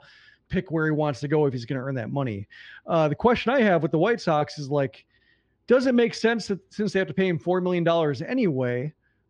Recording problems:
muffled; slightly; fading above 4 kHz

